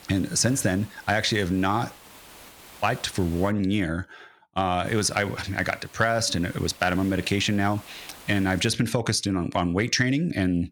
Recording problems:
hiss; faint; until 3.5 s and from 5 to 8.5 s; 20 dB below the speech

